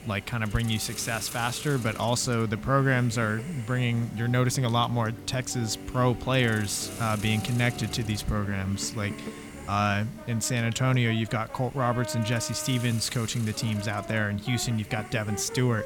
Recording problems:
background music; noticeable; throughout; 15 dB below the speech
hiss; noticeable; throughout; 15 dB below the speech

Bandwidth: 17.5 kHz